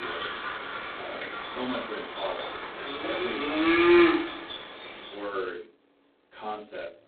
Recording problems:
phone-call audio; poor line; nothing above 4 kHz
off-mic speech; far
room echo; slight; dies away in 0.3 s
animal sounds; very loud; throughout; 10 dB above the speech
abrupt cut into speech; at the start

